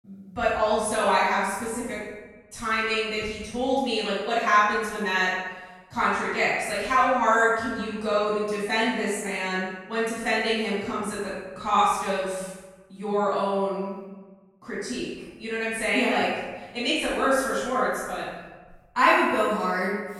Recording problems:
room echo; strong; dies away in 1.1 s
off-mic speech; far

